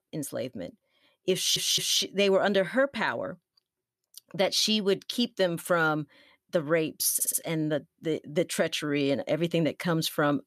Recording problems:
audio stuttering; at 1.5 s and at 7 s

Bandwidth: 14 kHz